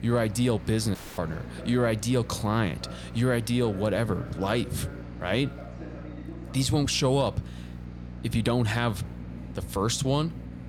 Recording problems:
train or aircraft noise; noticeable; throughout; 20 dB below the speech
electrical hum; faint; throughout; 60 Hz, 20 dB below the speech
audio cutting out; at 1 s

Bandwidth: 18.5 kHz